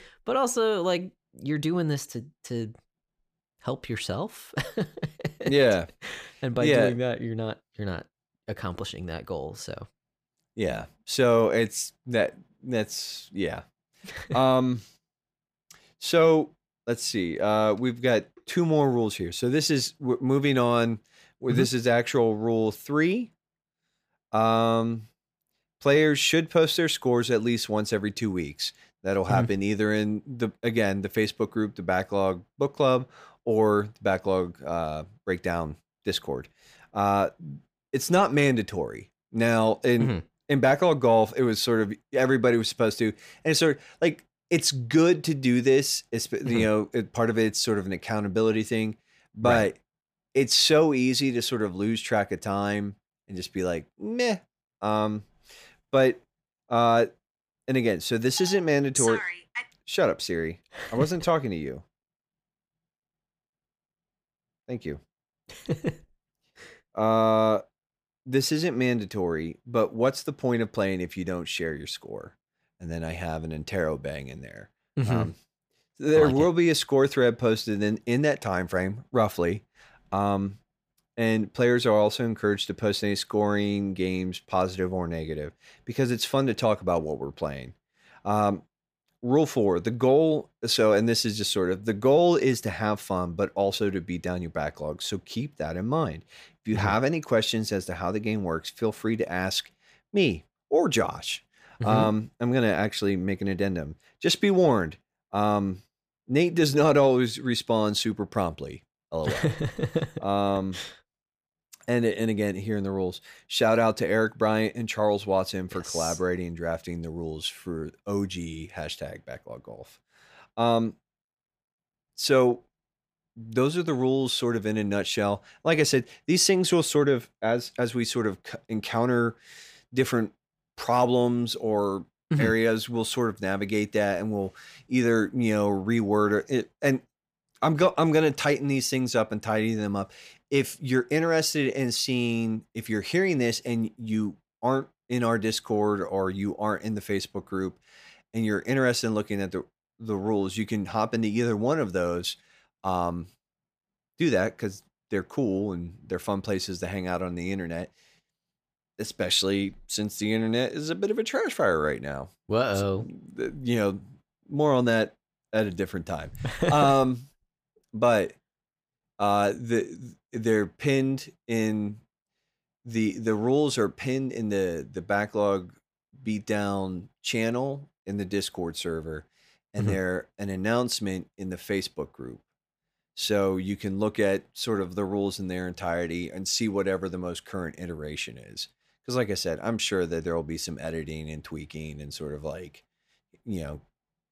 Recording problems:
none

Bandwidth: 15 kHz